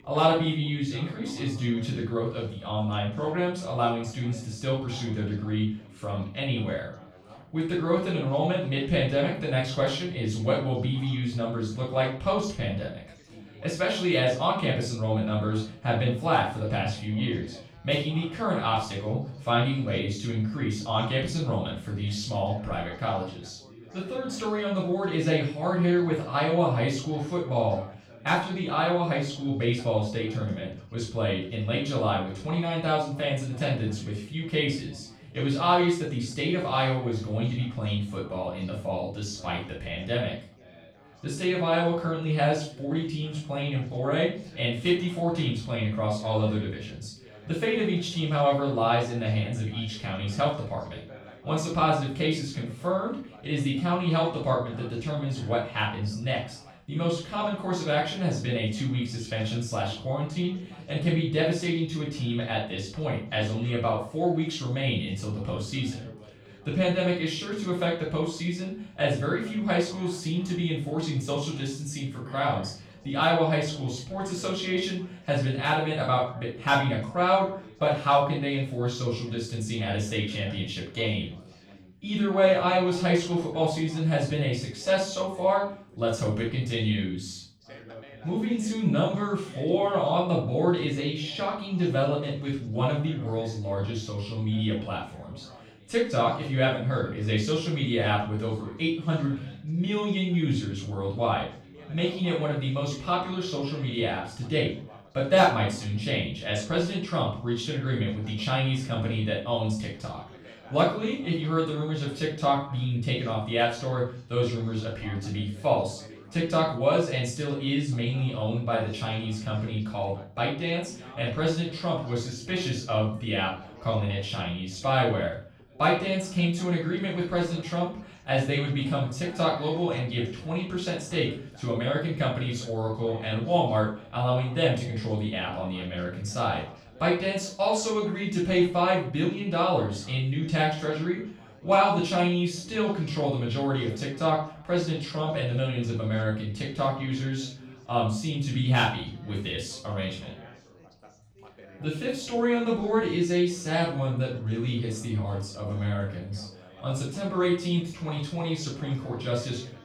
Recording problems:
off-mic speech; far
room echo; noticeable; dies away in 0.4 s
background chatter; faint; throughout; 3 voices, 20 dB below the speech

